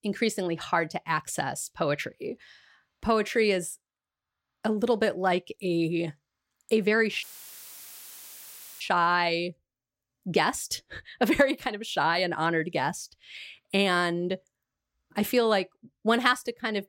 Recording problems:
audio cutting out; filled with static; at 7 s for 1.5 s

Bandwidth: 16 kHz